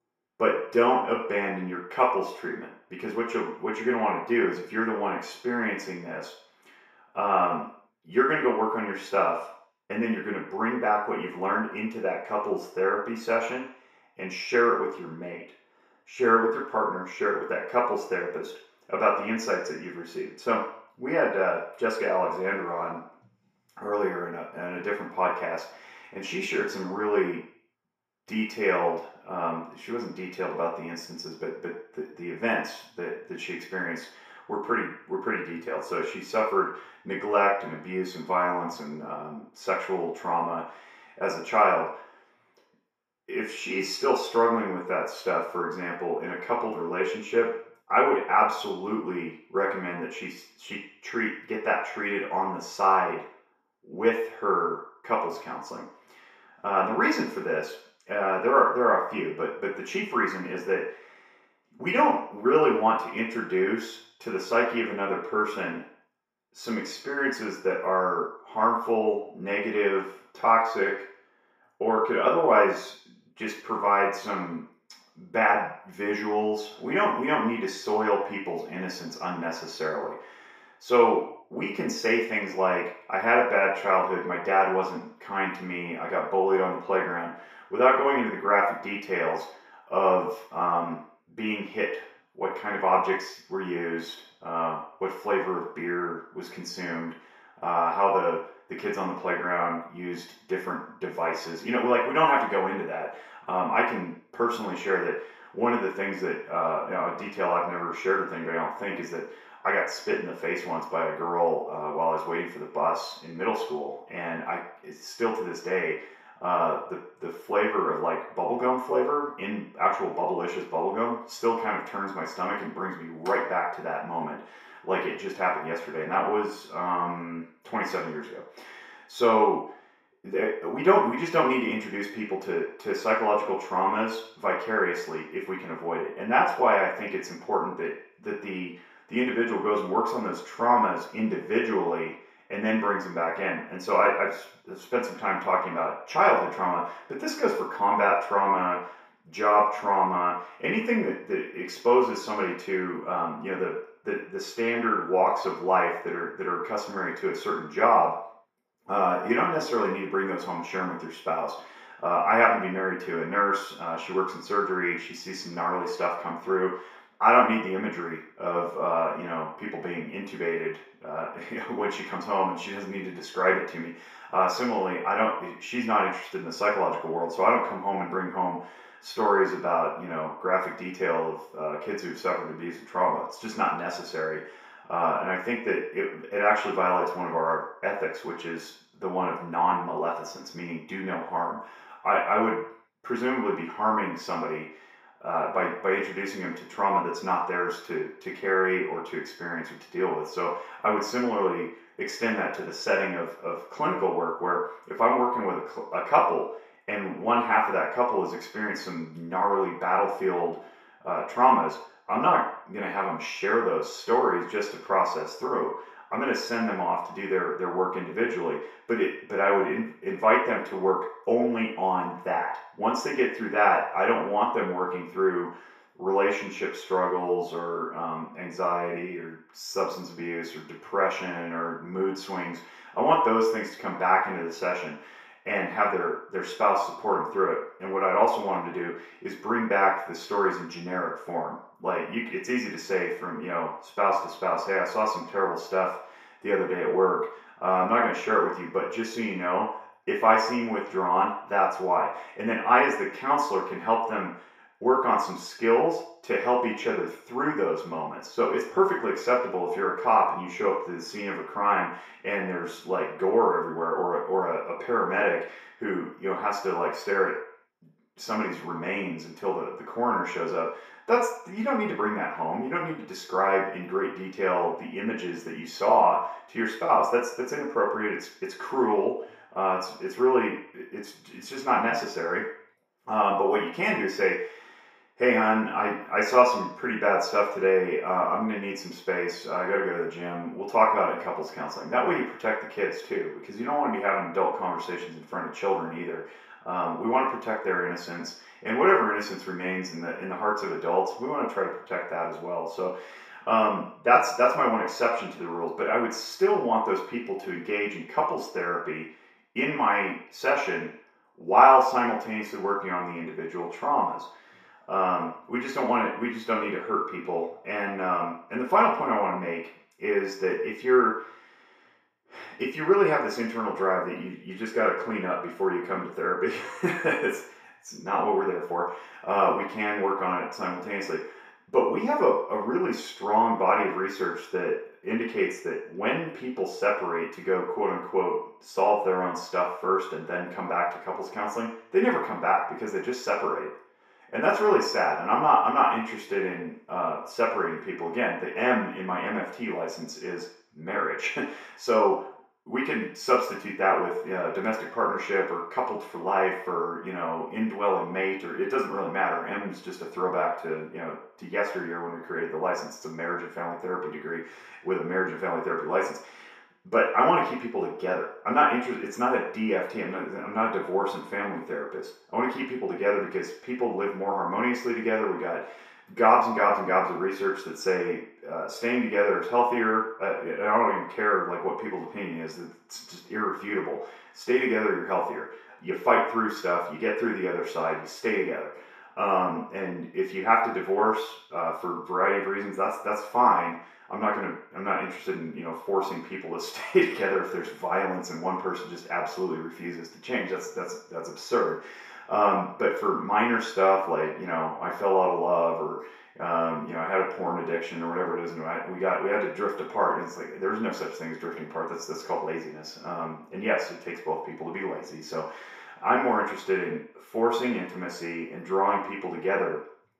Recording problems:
off-mic speech; far
room echo; noticeable; dies away in 0.6 s

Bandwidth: 15 kHz